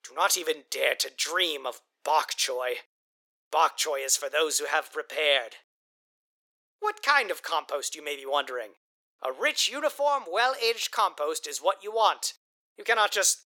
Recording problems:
thin; very; fading below 400 Hz

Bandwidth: 17.5 kHz